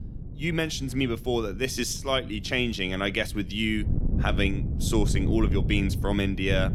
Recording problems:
wind noise on the microphone; occasional gusts; 15 dB below the speech

